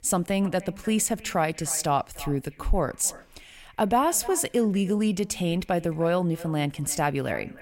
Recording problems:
echo of what is said; faint; throughout; 300 ms later, 20 dB below the speech

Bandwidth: 16 kHz